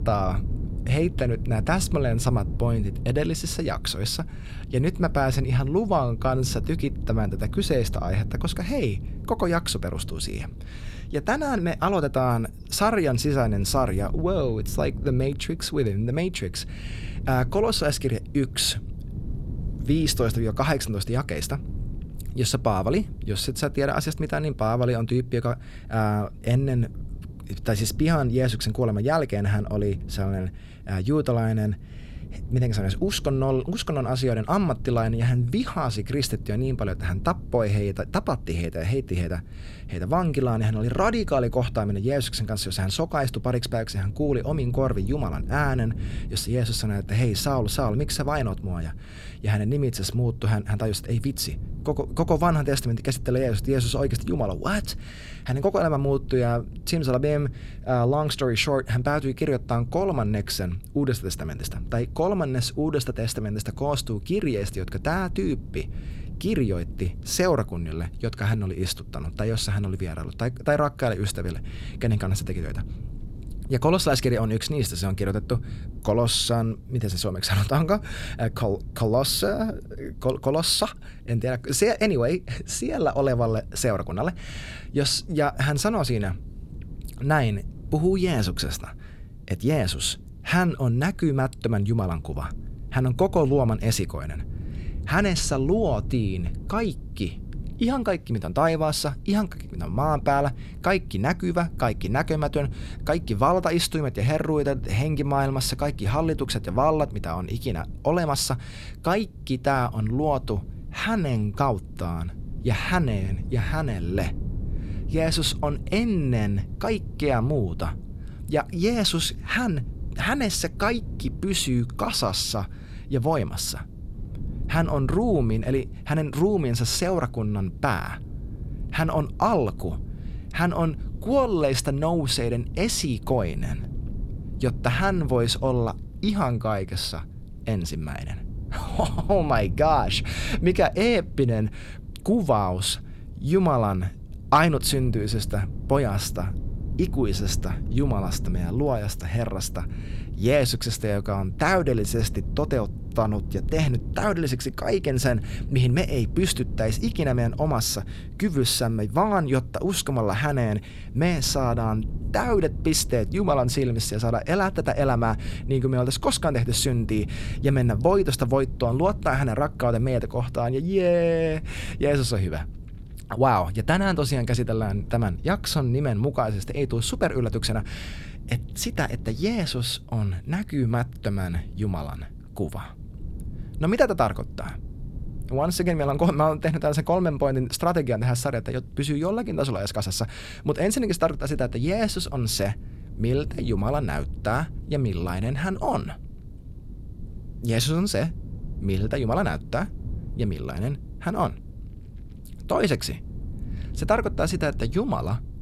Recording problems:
wind noise on the microphone; occasional gusts; 20 dB below the speech

